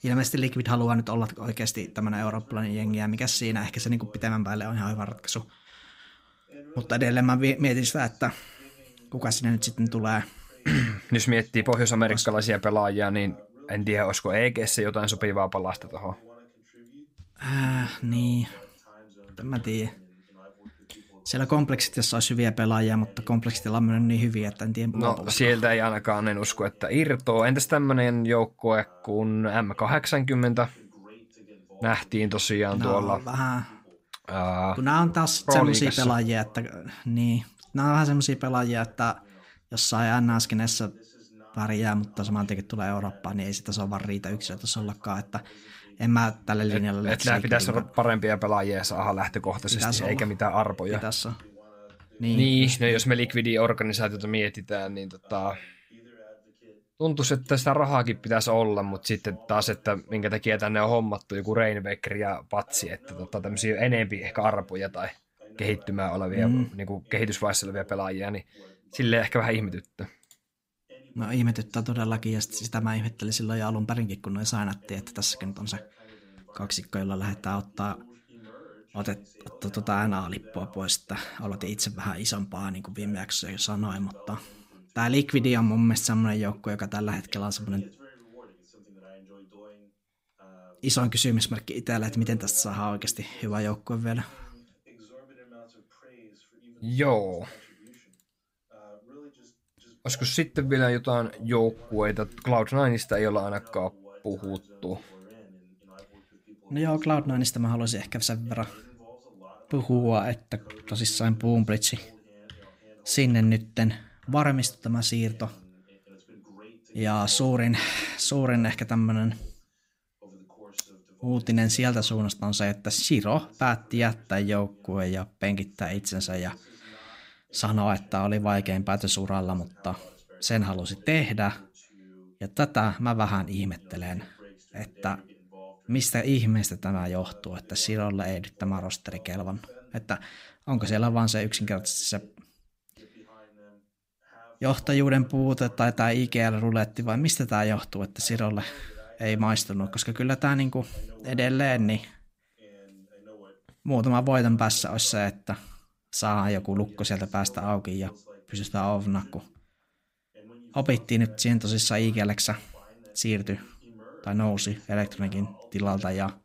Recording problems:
voice in the background; faint; throughout; 25 dB below the speech

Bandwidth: 15.5 kHz